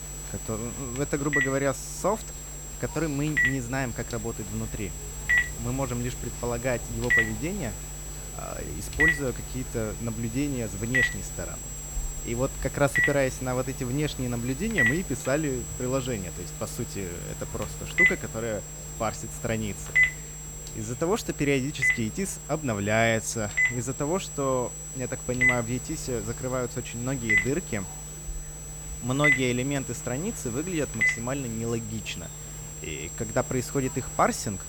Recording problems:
alarms or sirens; very loud; throughout; 3 dB above the speech
high-pitched whine; loud; throughout; 7.5 kHz, 8 dB below the speech
murmuring crowd; faint; throughout; 20 dB below the speech

